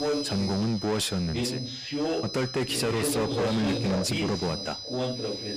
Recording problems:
distortion; heavy; 7 dB below the speech
high-pitched whine; loud; throughout; 5 kHz, 8 dB below the speech
voice in the background; loud; throughout; 3 dB below the speech

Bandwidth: 15 kHz